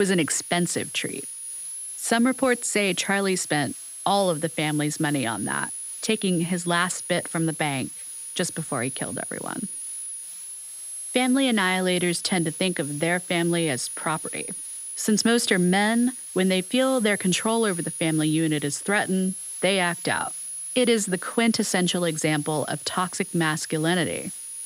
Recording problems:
high-pitched whine; loud; throughout; 10.5 kHz, 9 dB below the speech
hiss; faint; throughout; 20 dB below the speech
abrupt cut into speech; at the start

